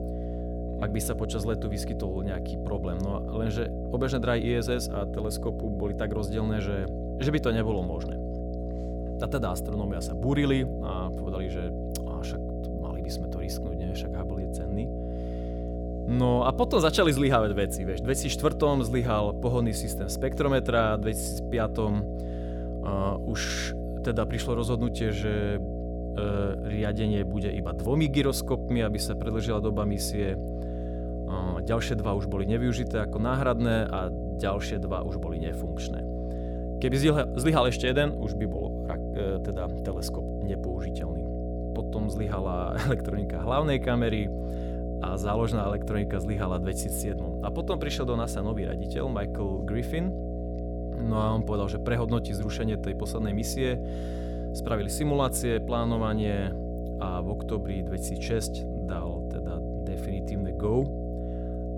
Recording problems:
electrical hum; loud; throughout; 60 Hz, 7 dB below the speech

